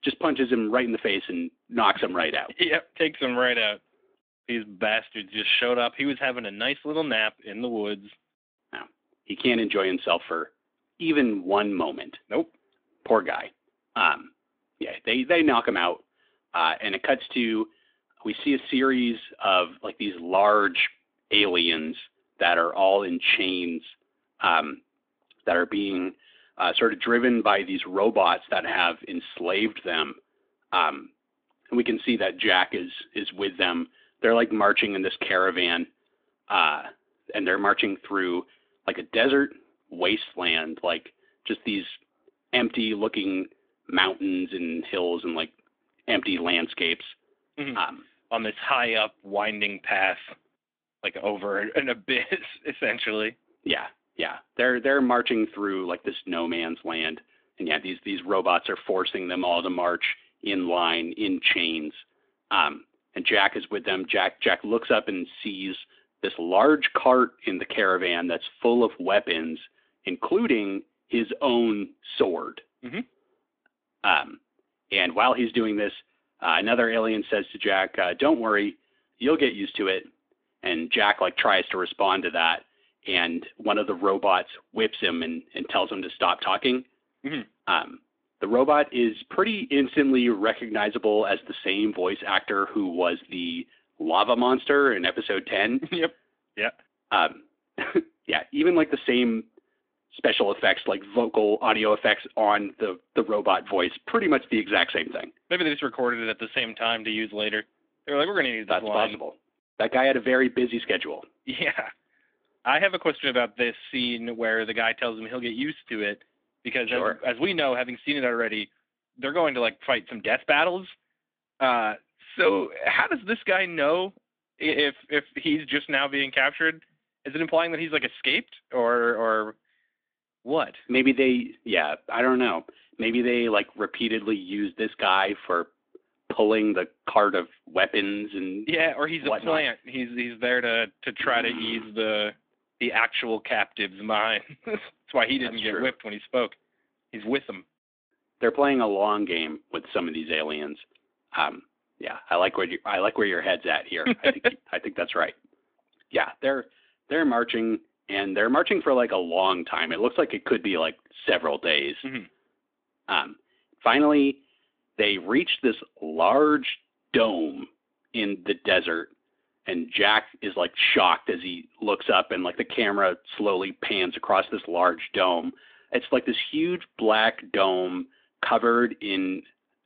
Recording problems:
phone-call audio; nothing above 3.5 kHz

